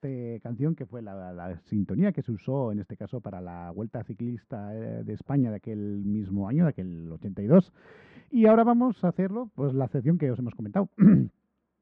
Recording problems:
muffled; very; fading above 1.5 kHz

